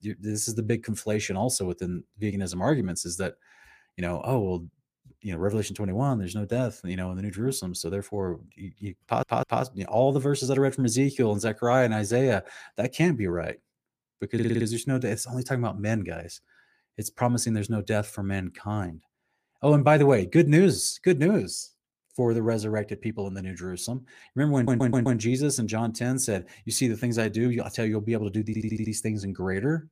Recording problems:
audio stuttering; 4 times, first at 9 s

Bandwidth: 15 kHz